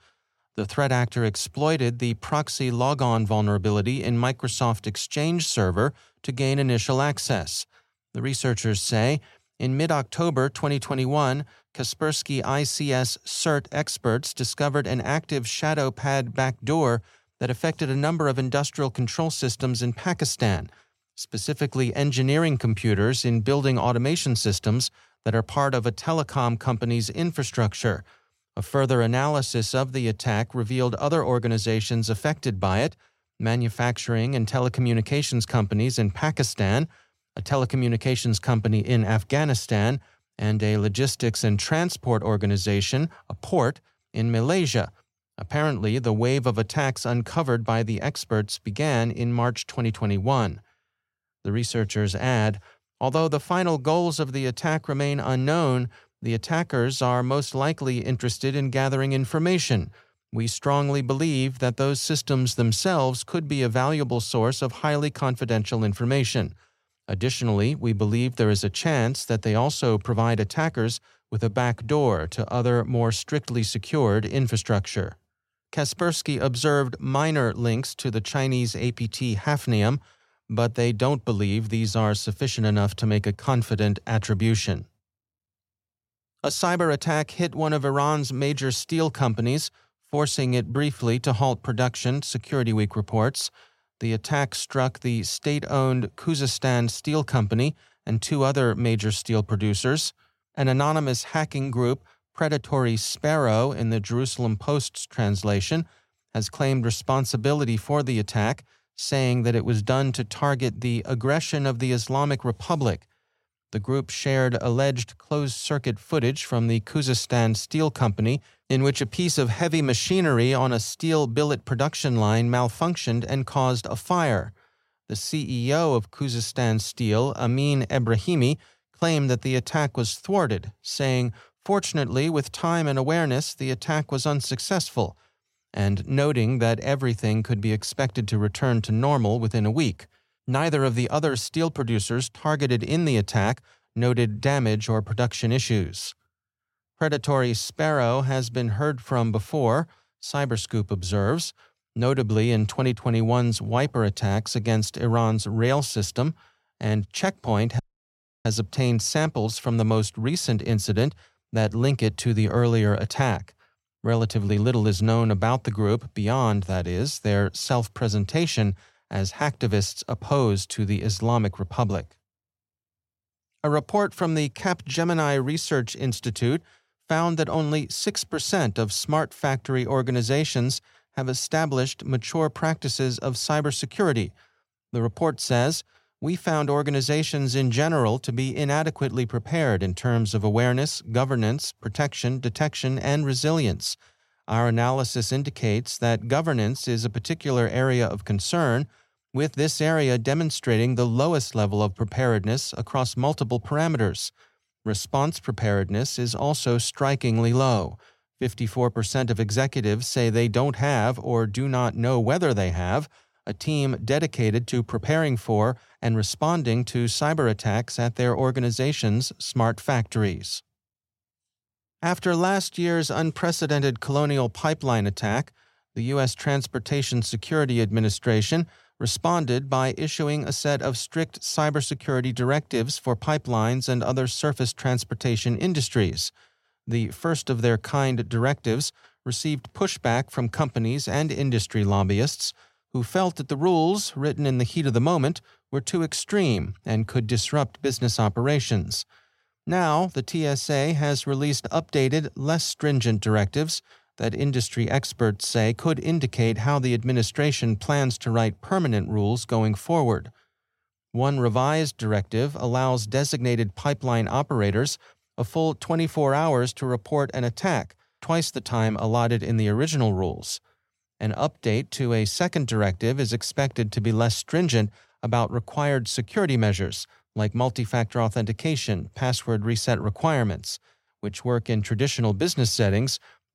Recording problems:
audio cutting out; at 2:38 for 0.5 s

